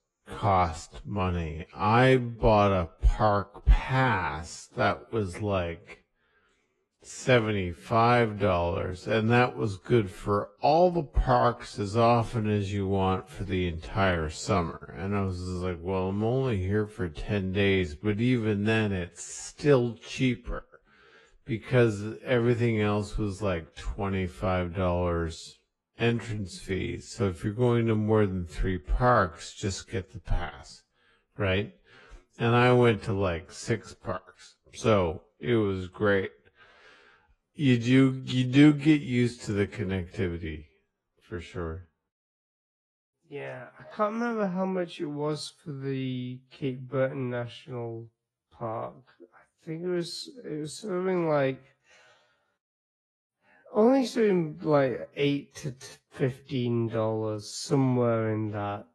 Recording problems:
wrong speed, natural pitch; too slow; 0.5 times normal speed
garbled, watery; slightly

